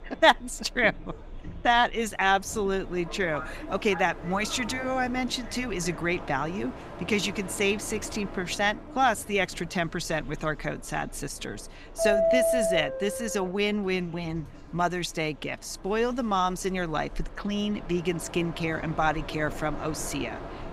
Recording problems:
train or aircraft noise; loud; throughout; 7 dB below the speech
background chatter; faint; throughout; 3 voices, 30 dB below the speech

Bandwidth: 15.5 kHz